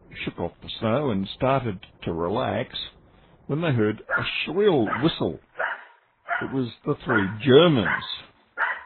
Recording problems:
garbled, watery; badly; nothing above 4 kHz
animal sounds; loud; throughout; 5 dB below the speech

